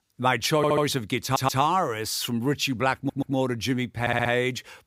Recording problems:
audio stuttering; 4 times, first at 0.5 s

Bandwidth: 15.5 kHz